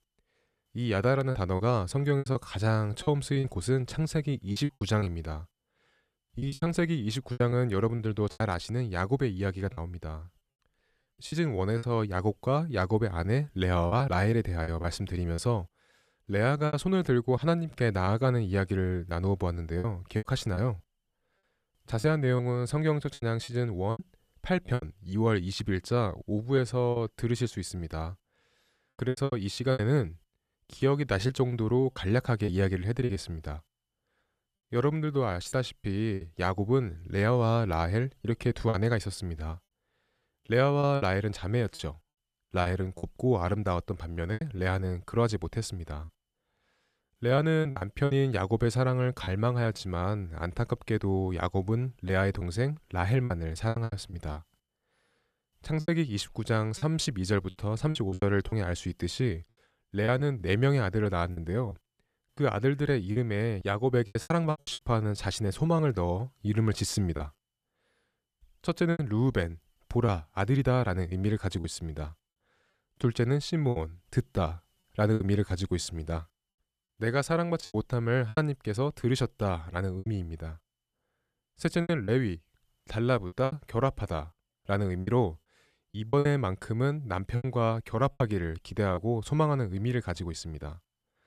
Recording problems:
choppy; very; 8% of the speech affected

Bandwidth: 14.5 kHz